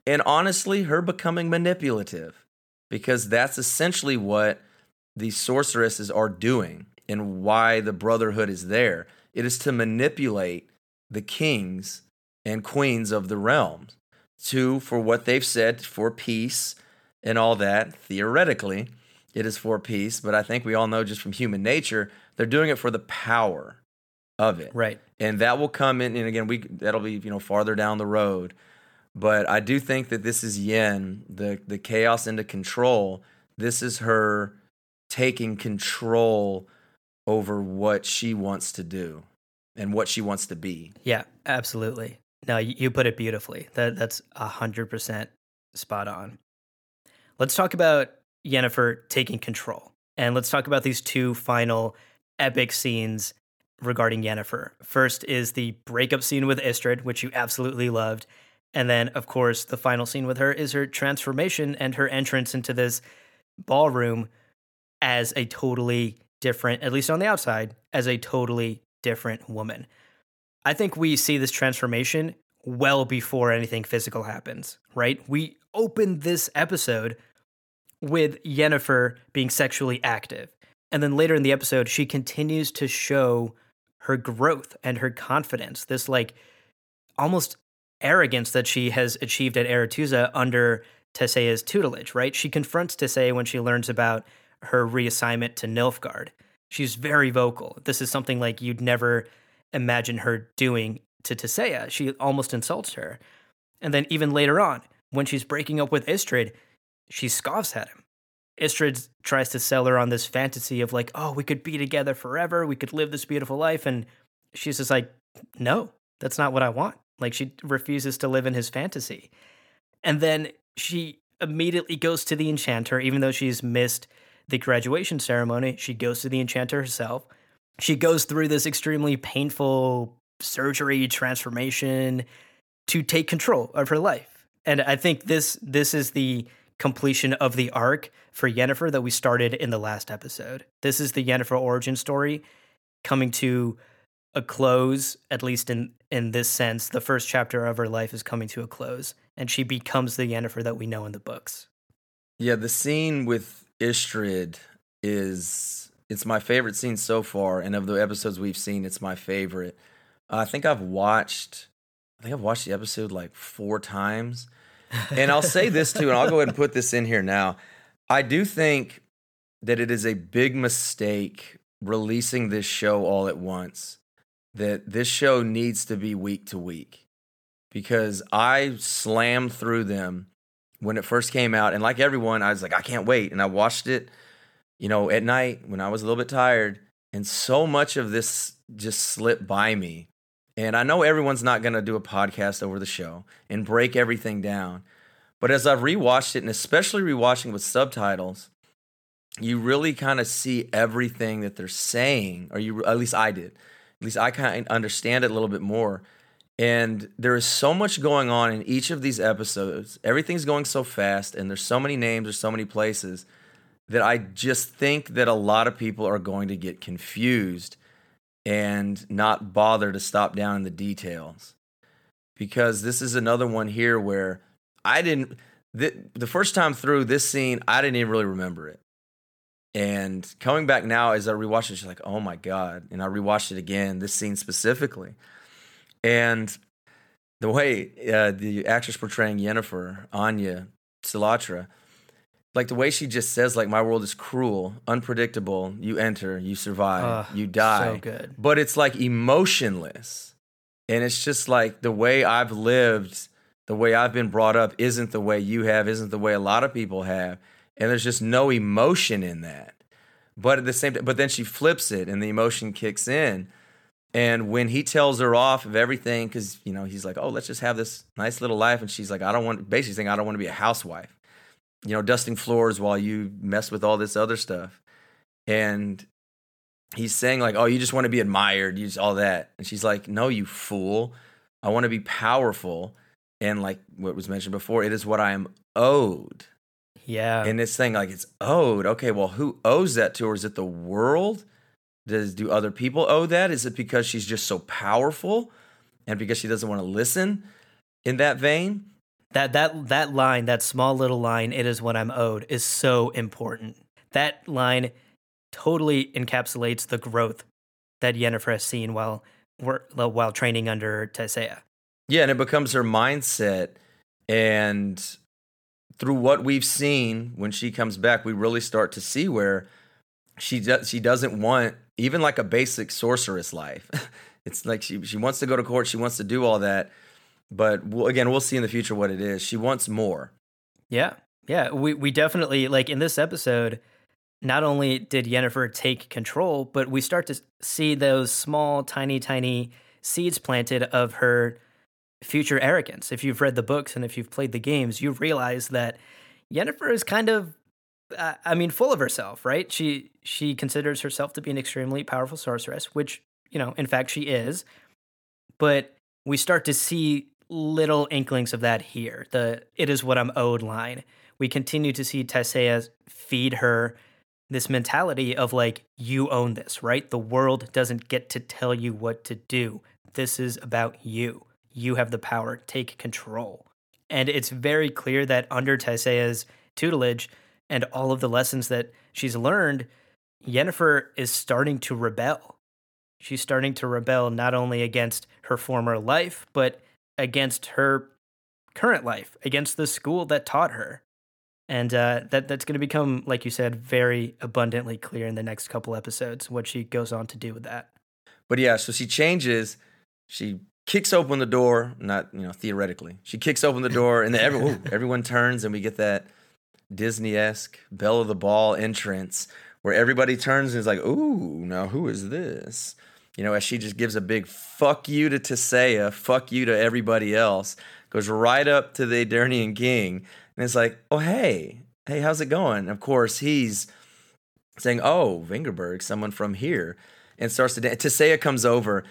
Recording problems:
none

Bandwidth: 18.5 kHz